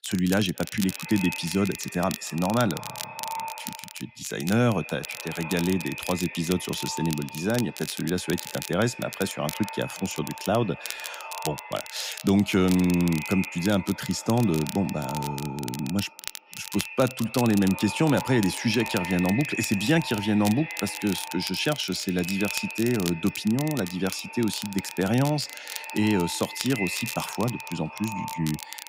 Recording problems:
echo of what is said; strong; throughout; 220 ms later, 10 dB below the speech
crackle, like an old record; noticeable; 10 dB below the speech

